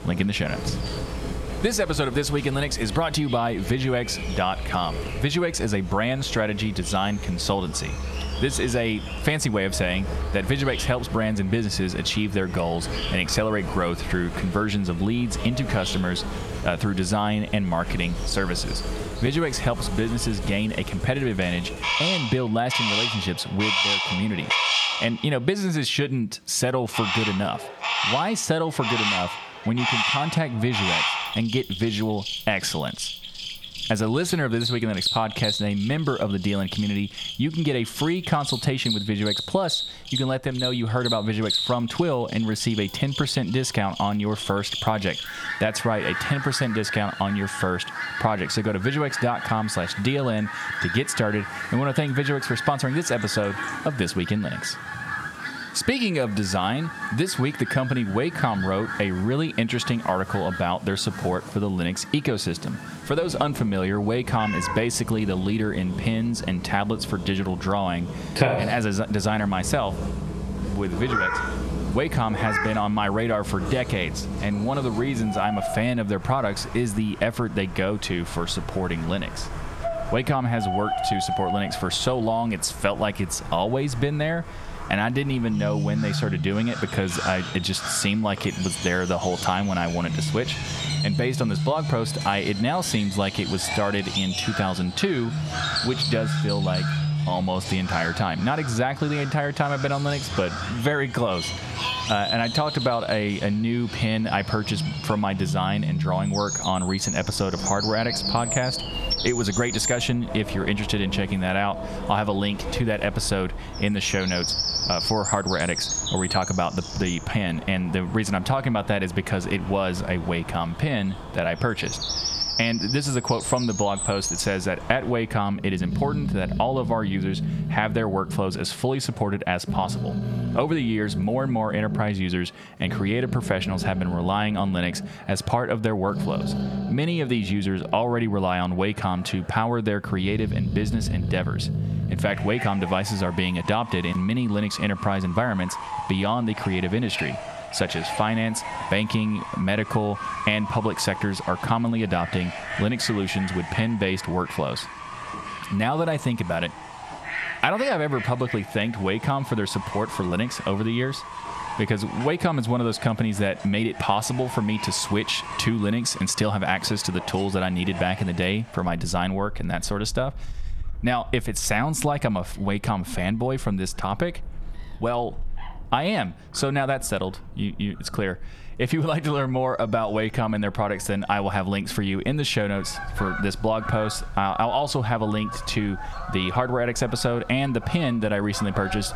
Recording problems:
squashed, flat; somewhat, background pumping
animal sounds; loud; throughout; 5 dB below the speech

